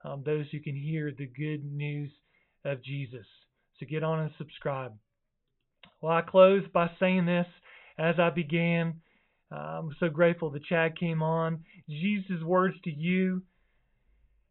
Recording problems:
high frequencies cut off; severe; nothing above 4 kHz

